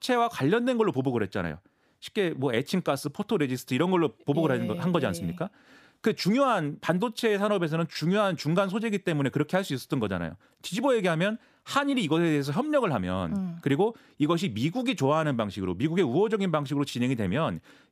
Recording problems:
none

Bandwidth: 15 kHz